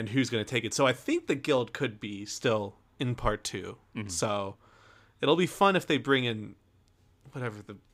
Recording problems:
abrupt cut into speech; at the start

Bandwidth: 15.5 kHz